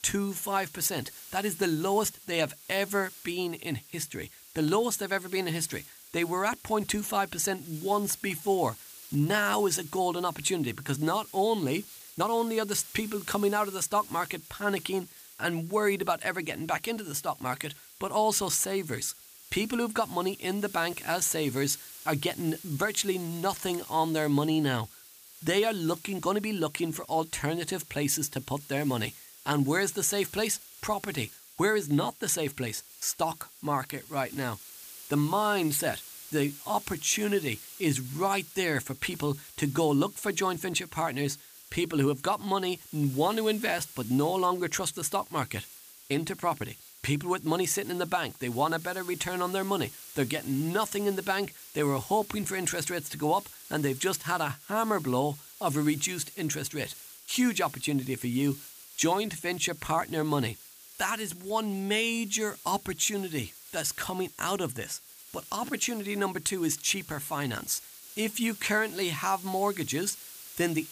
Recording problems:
hiss; noticeable; throughout; 15 dB below the speech
uneven, jittery; slightly; from 8 to 12 s

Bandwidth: 15 kHz